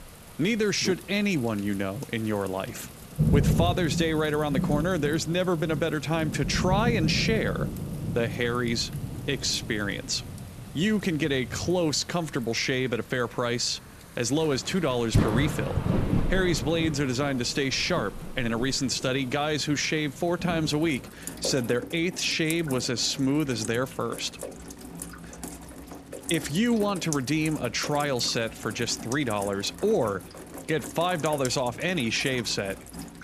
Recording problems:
rain or running water; loud; throughout; 7 dB below the speech

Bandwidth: 14.5 kHz